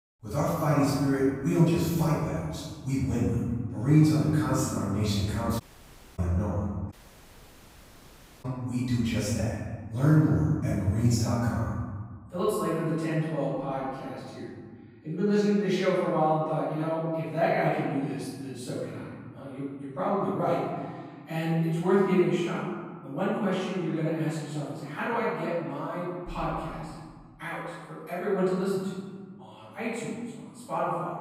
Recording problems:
room echo; strong; dies away in 1.6 s
off-mic speech; far
audio cutting out; at 5.5 s for 0.5 s and at 7 s for 1.5 s

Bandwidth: 15.5 kHz